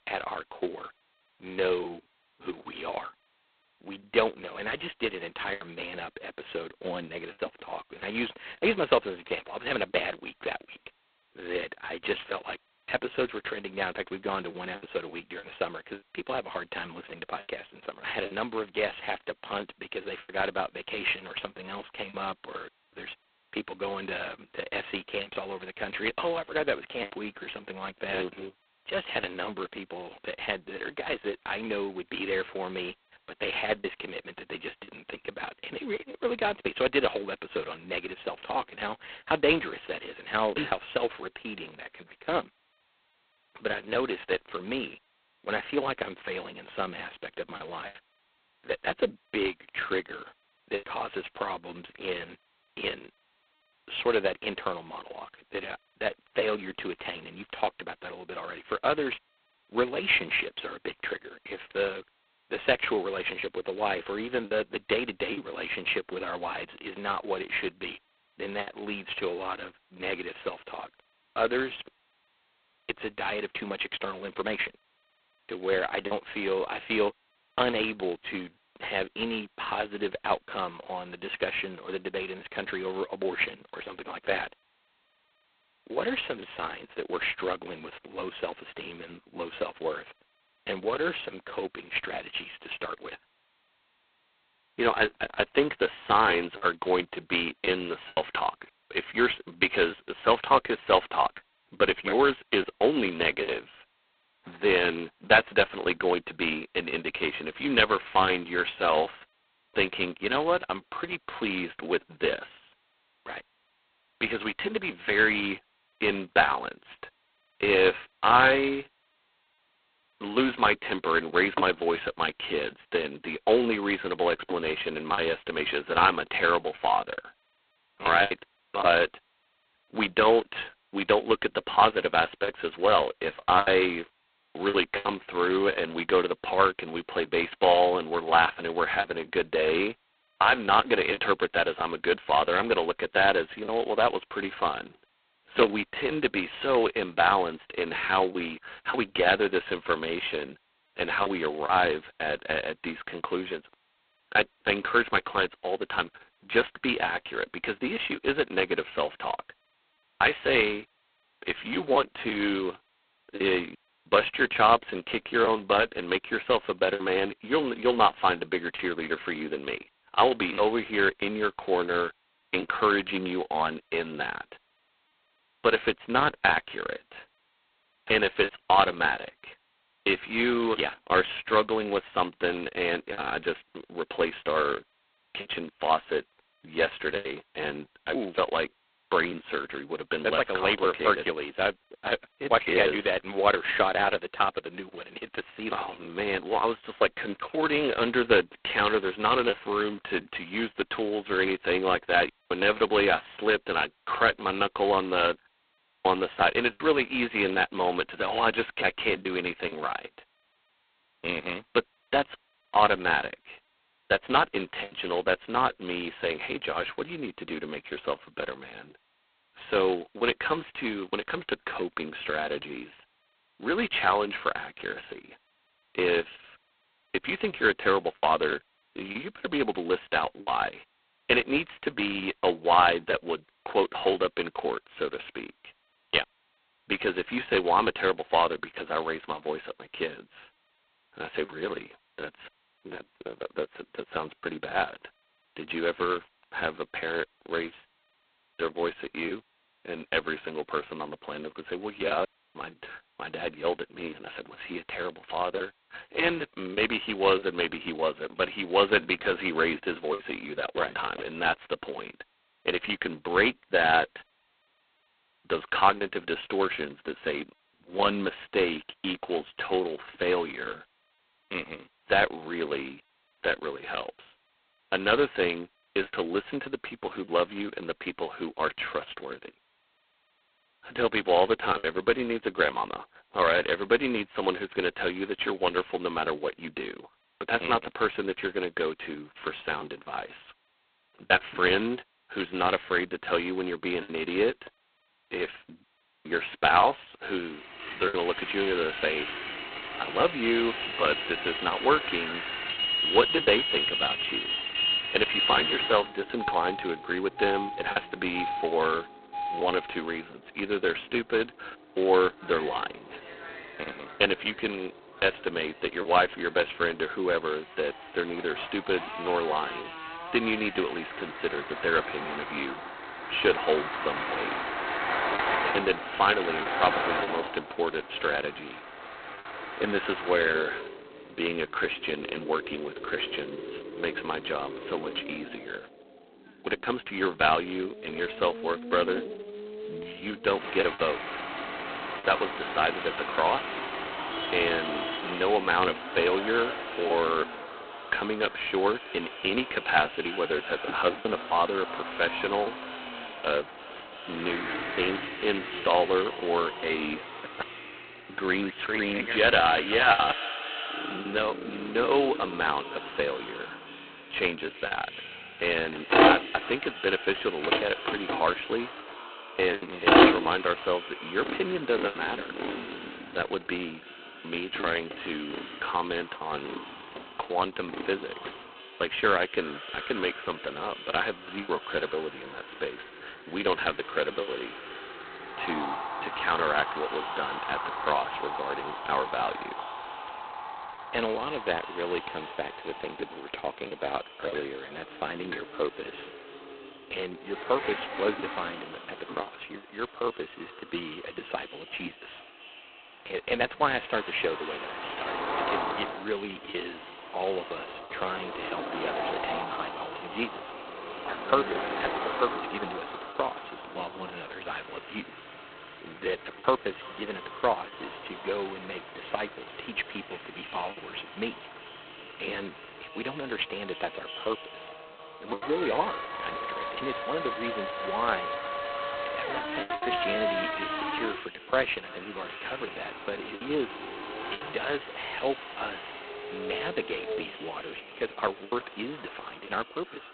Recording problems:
phone-call audio; poor line; nothing above 4 kHz
echo of what is said; noticeable; from 5:42 on; 330 ms later, 15 dB below the speech
traffic noise; loud; from 4:58 on; 5 dB below the speech
choppy; occasionally; 2% of the speech affected

